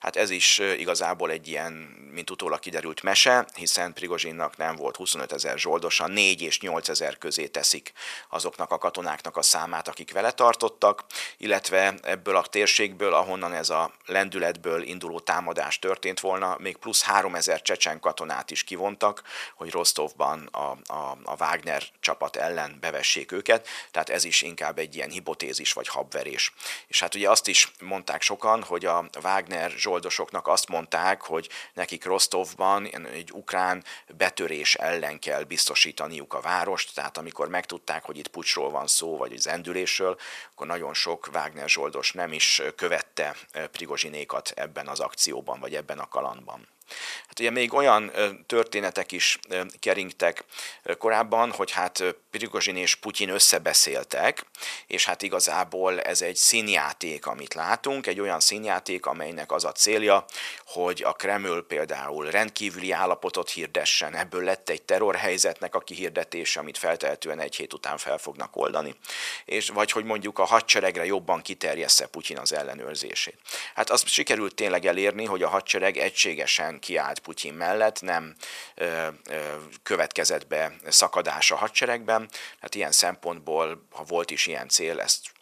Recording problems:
thin; very; fading below 700 Hz

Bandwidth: 14.5 kHz